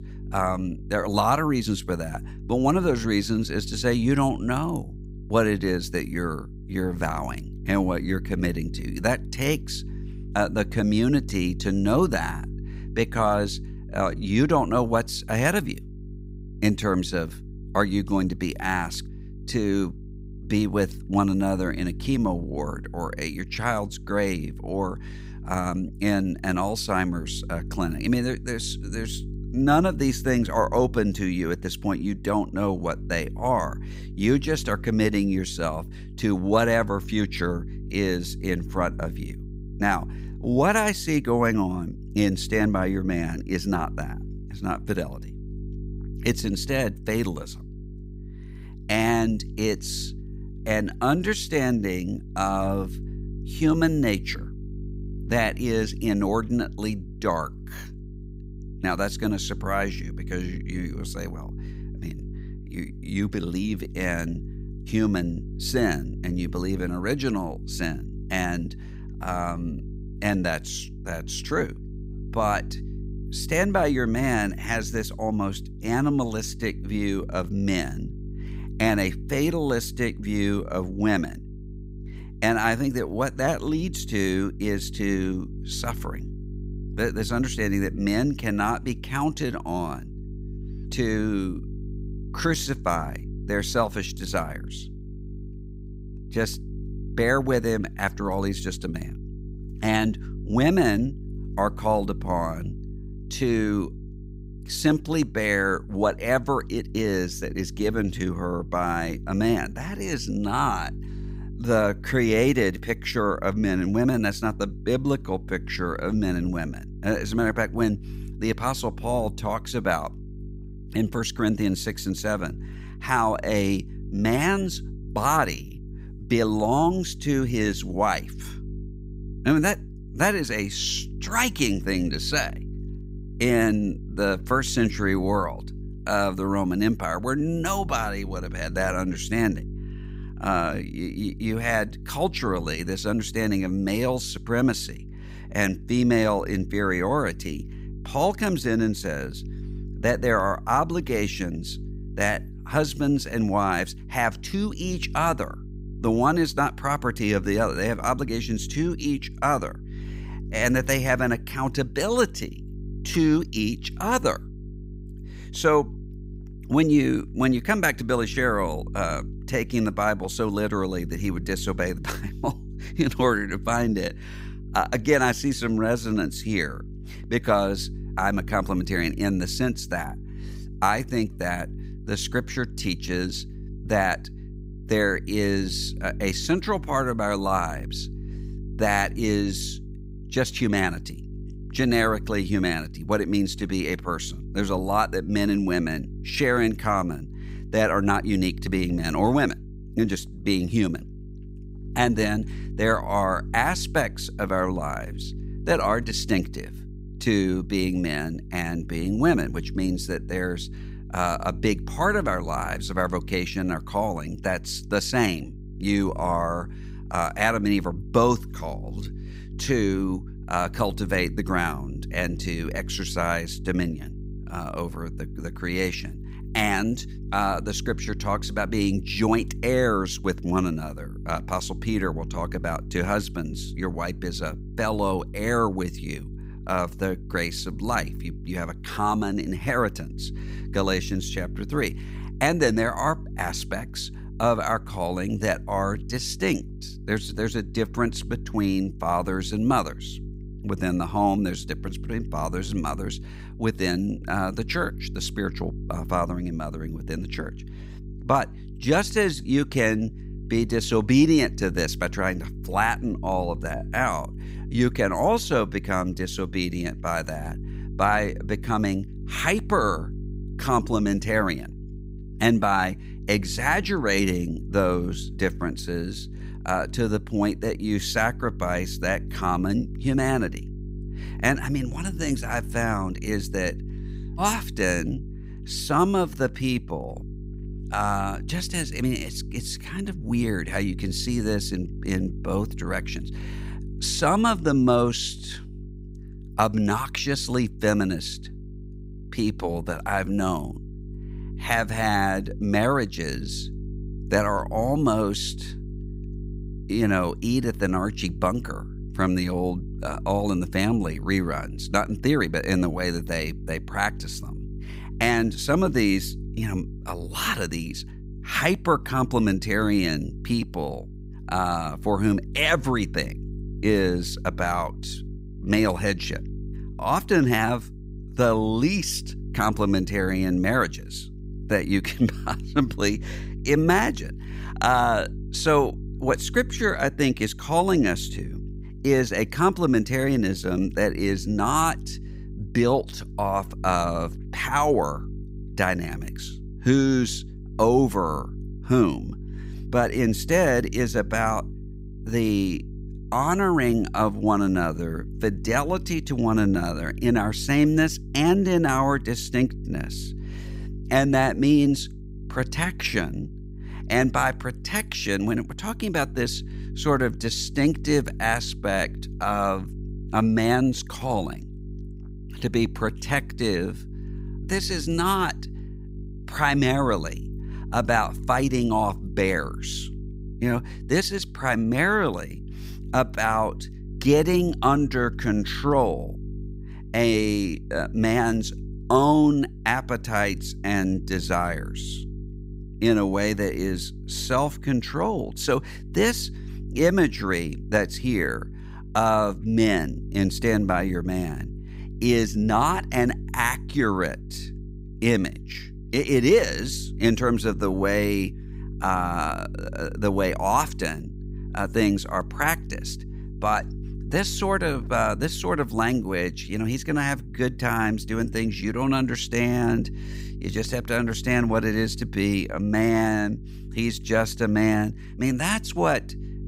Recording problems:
electrical hum; faint; throughout; 50 Hz, 20 dB below the speech

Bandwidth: 15.5 kHz